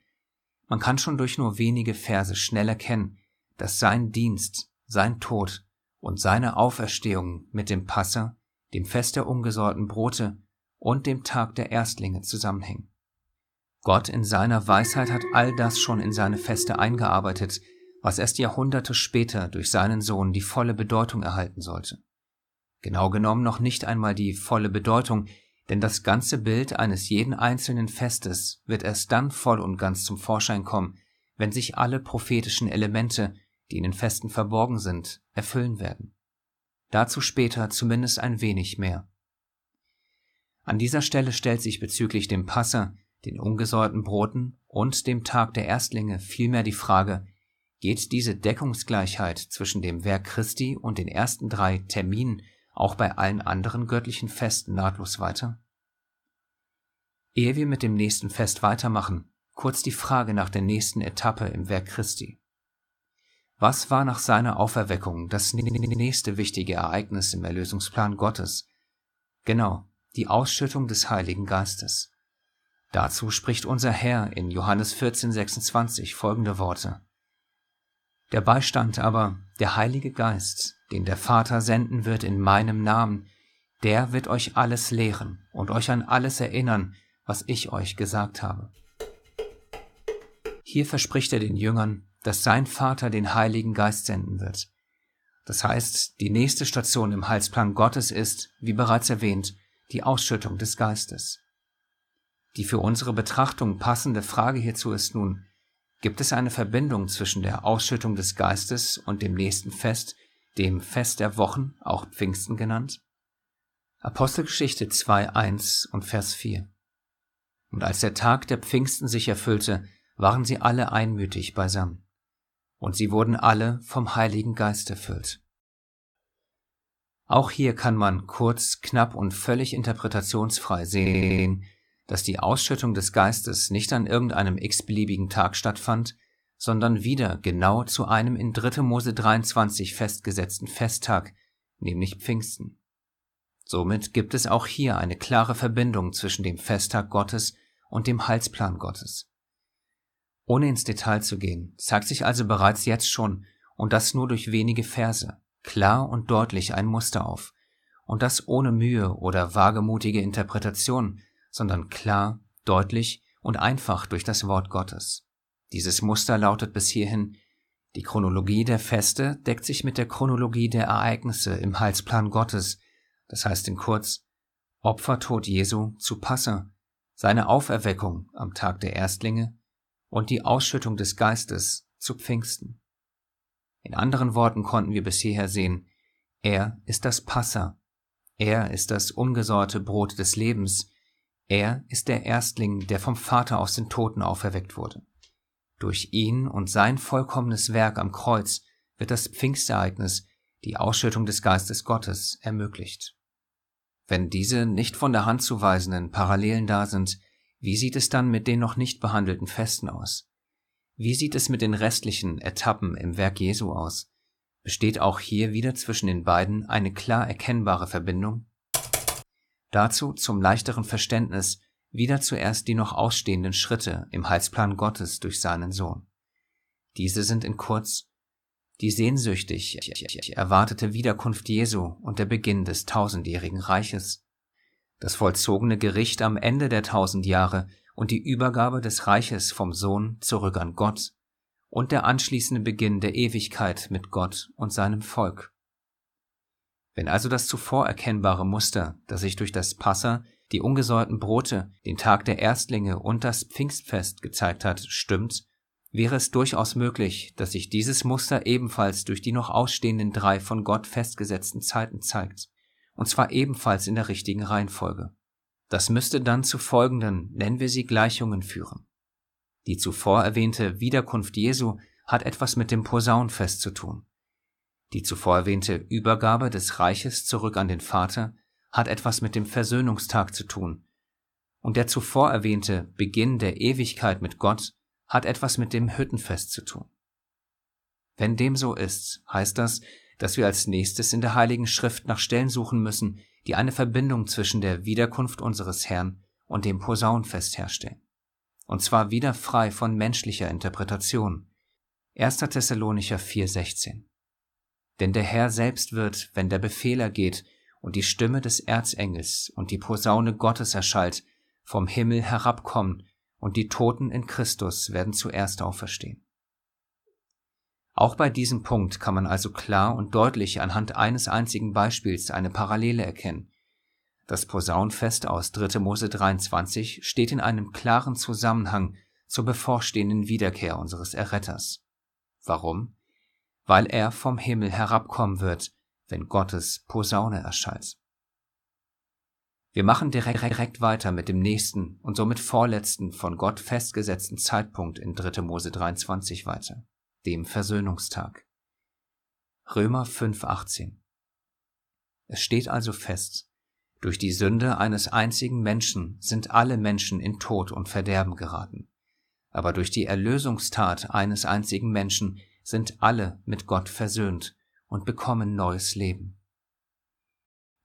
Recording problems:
alarm; noticeable; from 15 to 17 s; peak 6 dB below the speech
audio stuttering; 4 times, first at 1:06
clattering dishes; noticeable; from 1:29 to 1:31; peak 10 dB below the speech
keyboard typing; loud; at 3:39; peak 1 dB above the speech

